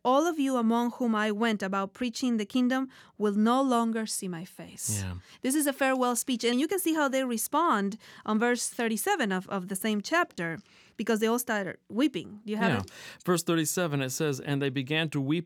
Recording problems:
none

